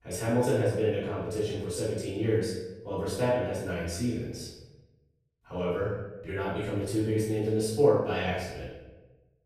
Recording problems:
room echo; strong; dies away in 0.9 s
off-mic speech; far

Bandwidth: 14.5 kHz